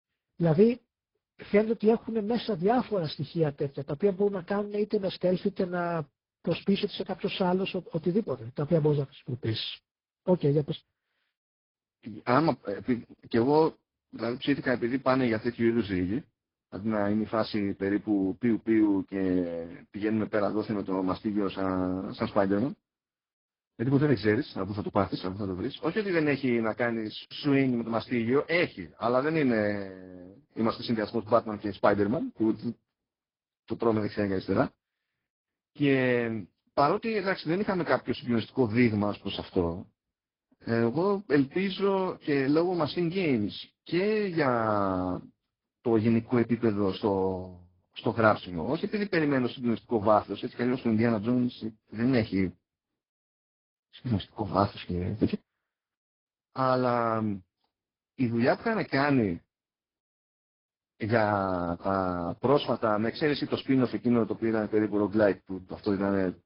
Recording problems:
garbled, watery; badly
high frequencies cut off; noticeable; nothing above 5 kHz

